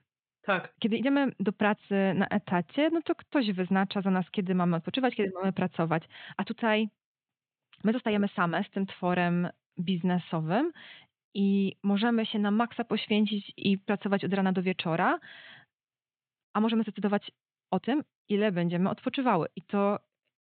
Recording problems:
high frequencies cut off; severe; nothing above 4 kHz
uneven, jittery; strongly; from 0.5 to 19 s

